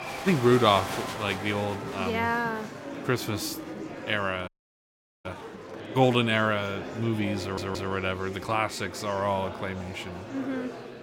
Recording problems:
murmuring crowd; loud; throughout; 10 dB below the speech
audio cutting out; at 4.5 s for 1 s
audio stuttering; at 7.5 s

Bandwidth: 16.5 kHz